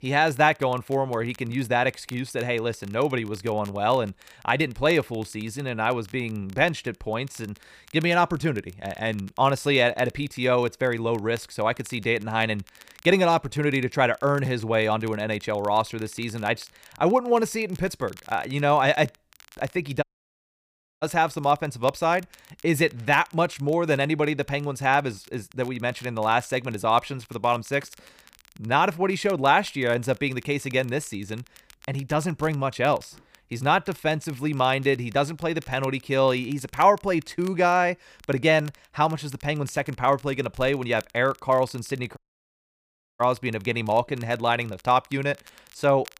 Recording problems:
crackle, like an old record; faint; 25 dB below the speech
audio cutting out; at 20 s for 1 s and at 42 s for 1 s

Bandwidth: 15 kHz